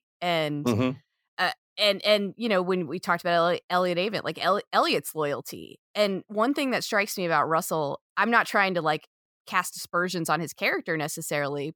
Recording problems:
none

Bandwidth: 18 kHz